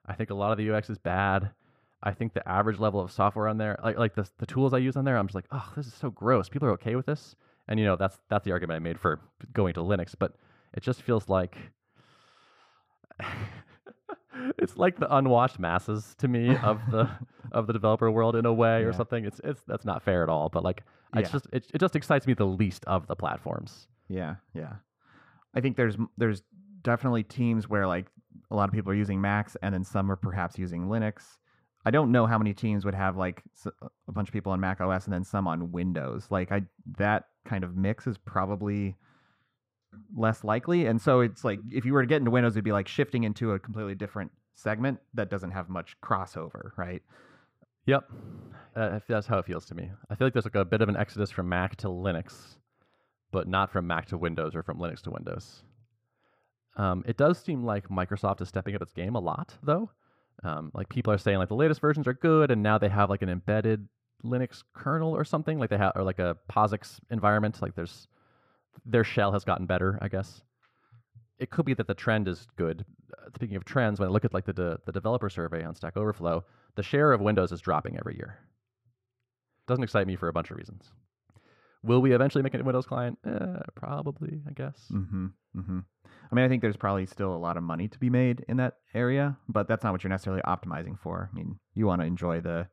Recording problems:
muffled; slightly; fading above 2.5 kHz

